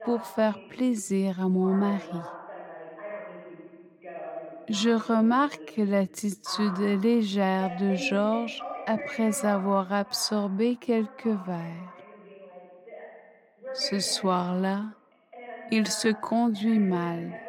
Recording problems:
wrong speed, natural pitch; too slow; 0.6 times normal speed
voice in the background; noticeable; throughout; 15 dB below the speech

